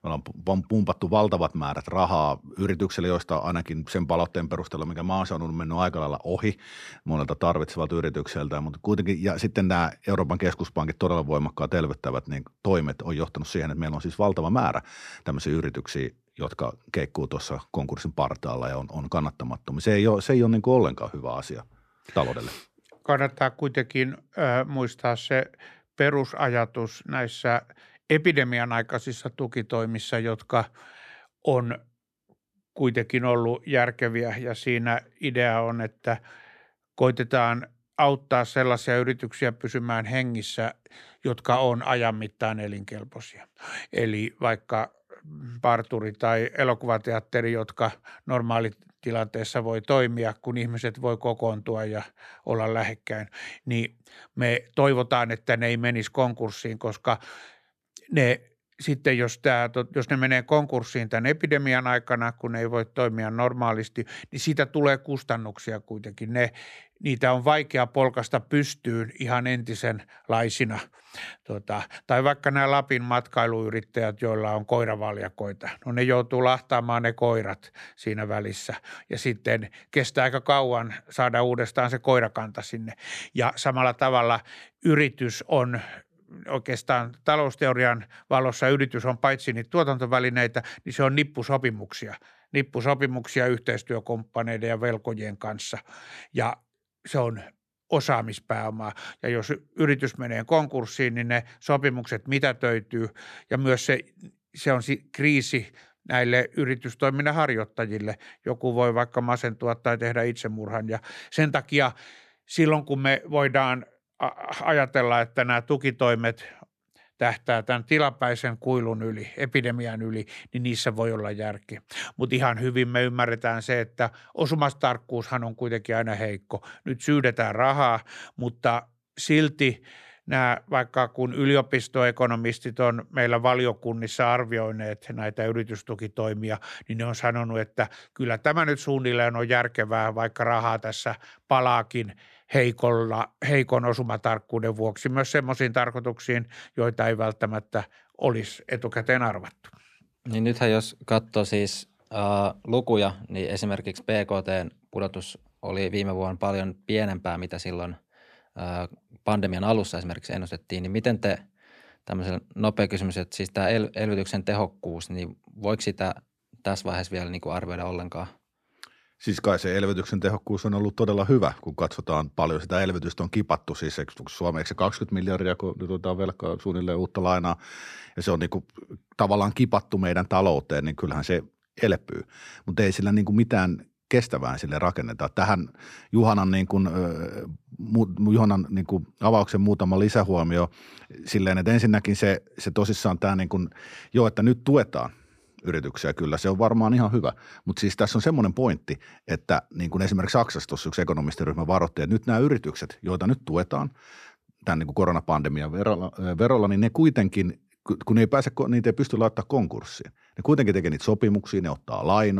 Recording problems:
abrupt cut into speech; at the end

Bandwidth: 14.5 kHz